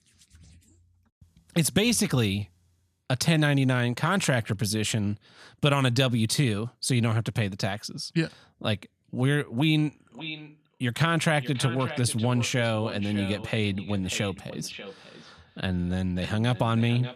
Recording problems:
echo of what is said; noticeable; from 10 s on; 590 ms later, 15 dB below the speech

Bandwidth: 14 kHz